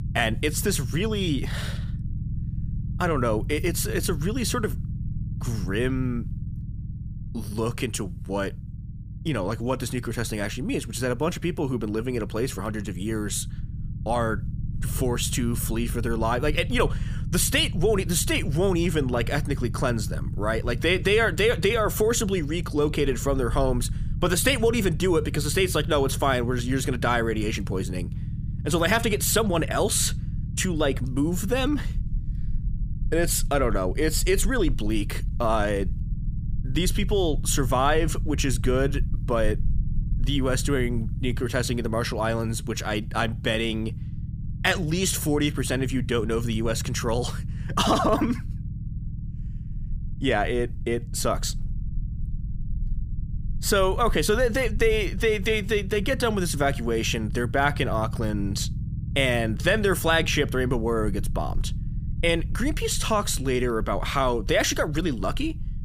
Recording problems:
low rumble; noticeable; throughout; 20 dB below the speech

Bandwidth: 15 kHz